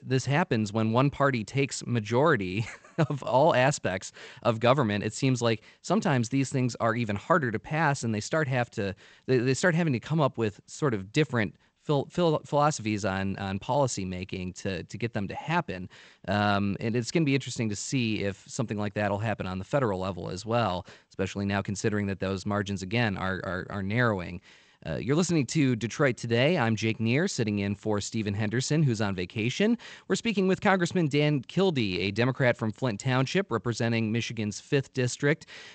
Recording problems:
garbled, watery; slightly; nothing above 8 kHz

